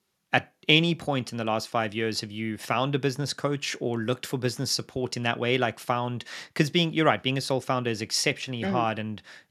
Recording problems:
none

